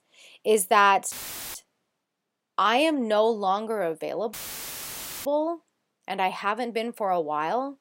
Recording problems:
audio cutting out; filled with static; at 1 s and at 4.5 s for 1 s

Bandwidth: 16 kHz